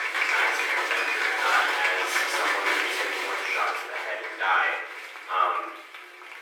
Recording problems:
off-mic speech; far
thin; very; fading below 300 Hz
room echo; noticeable; dies away in 0.6 s
crowd noise; very loud; throughout; 2 dB above the speech

